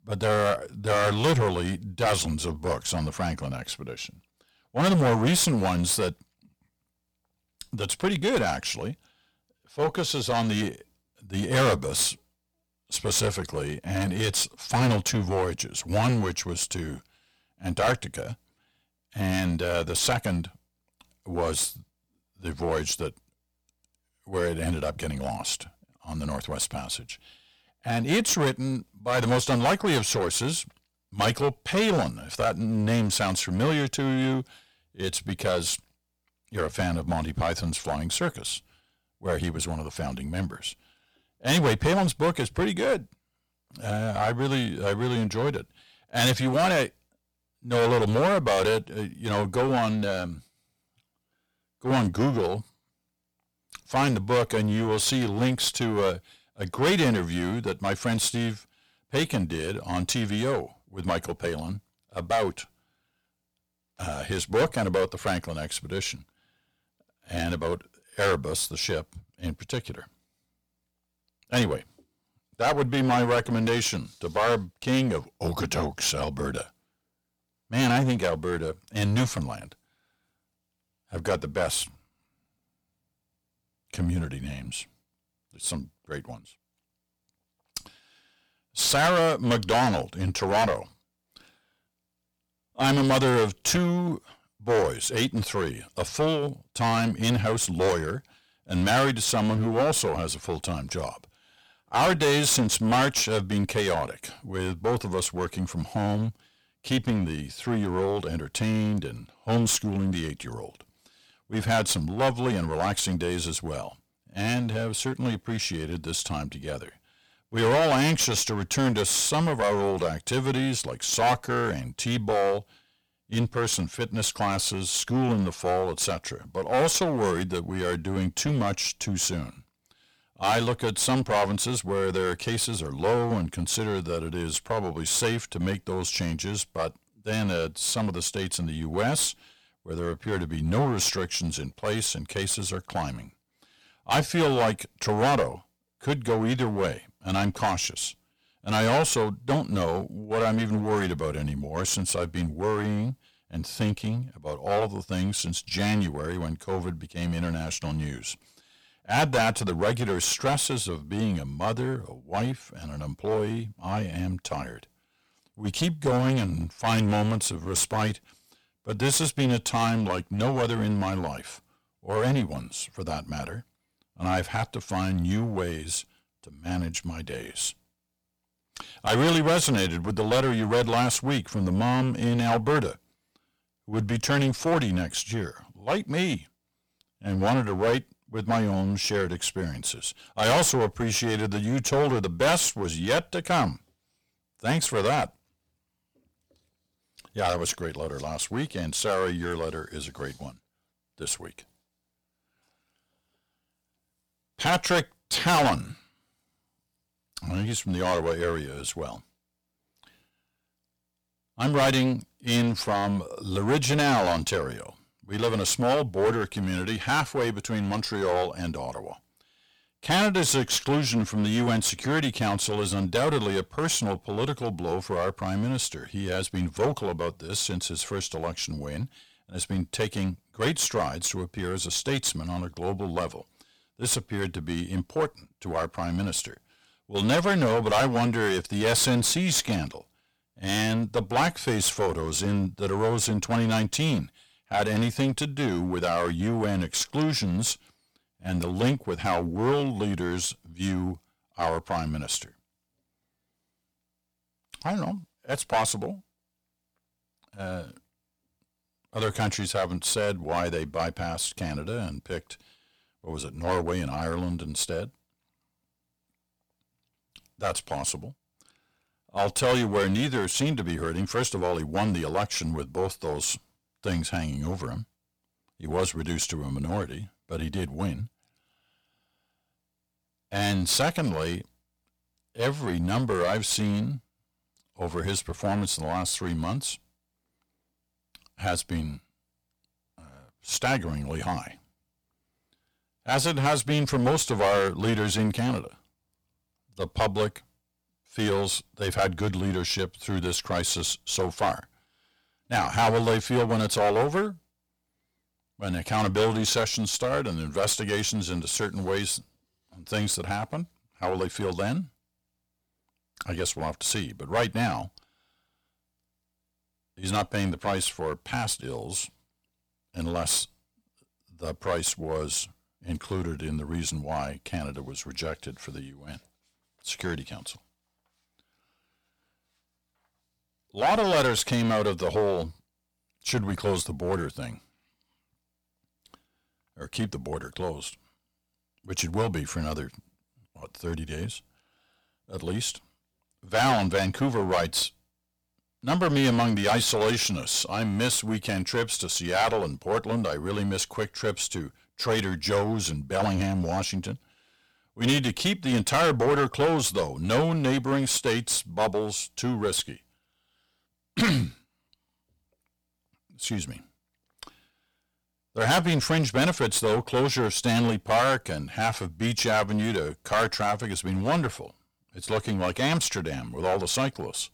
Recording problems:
distortion; heavy; 8% of the sound clipped

